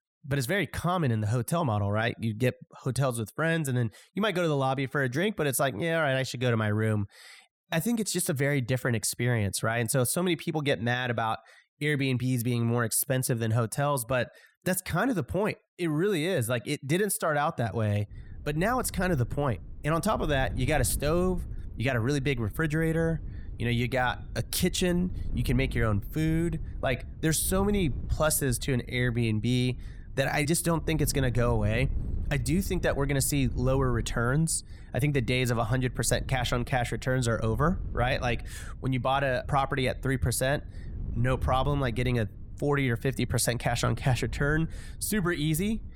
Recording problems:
wind noise on the microphone; occasional gusts; from 18 s on; 25 dB below the speech

